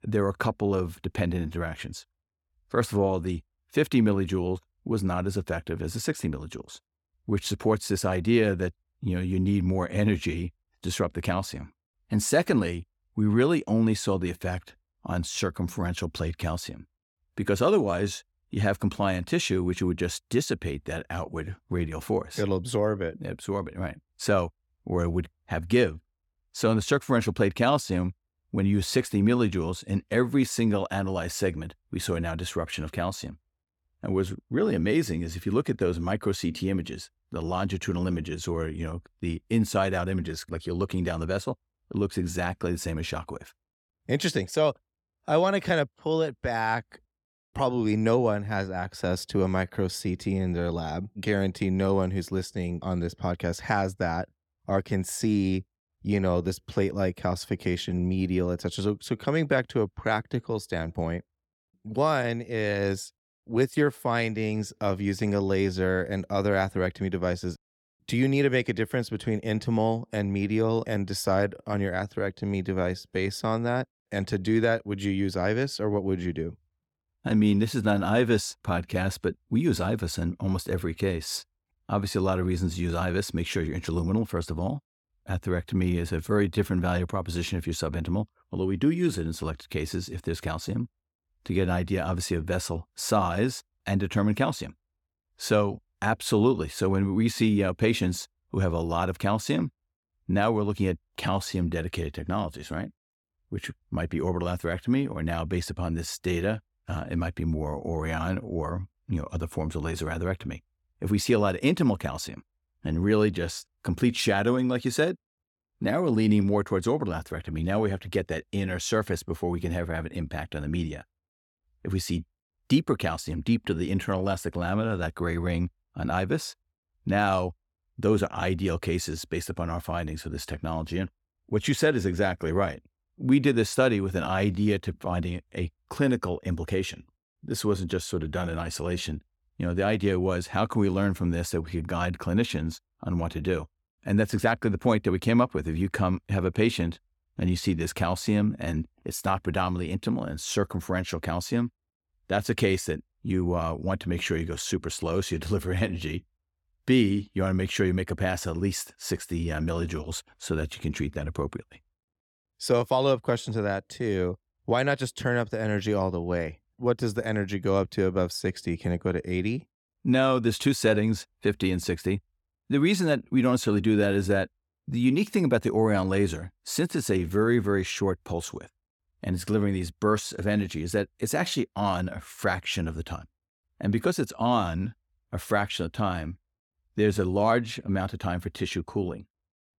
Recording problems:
none

